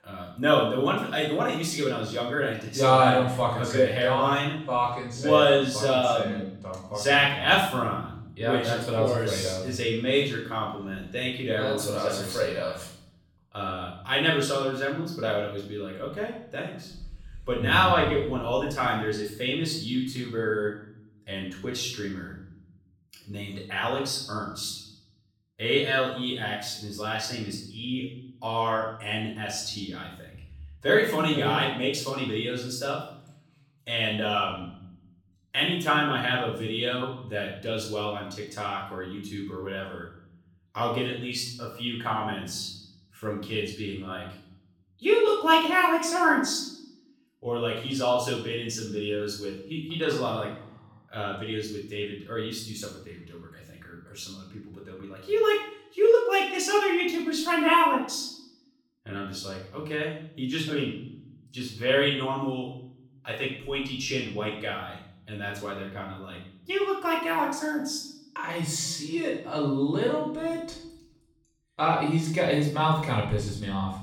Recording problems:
off-mic speech; far
room echo; noticeable; dies away in 0.7 s

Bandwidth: 17.5 kHz